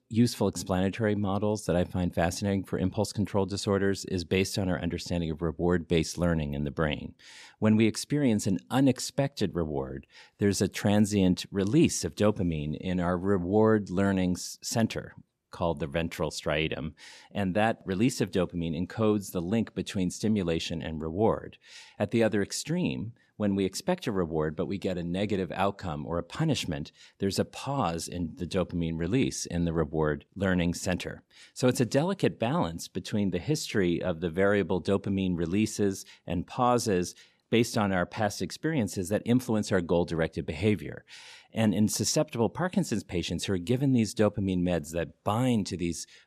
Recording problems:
none

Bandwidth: 14.5 kHz